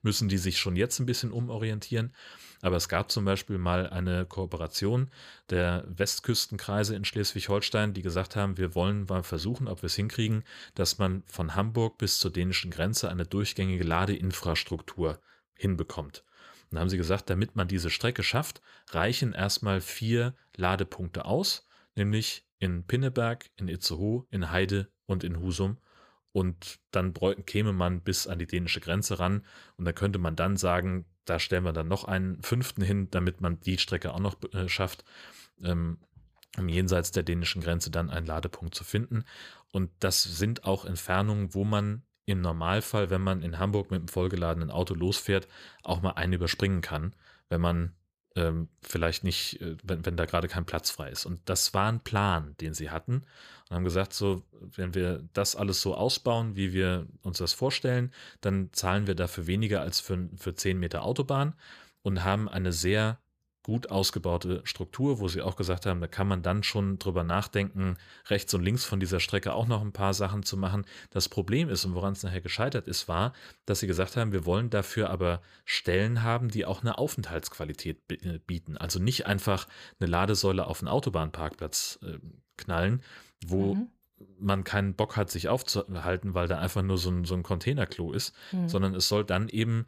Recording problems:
none

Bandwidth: 15 kHz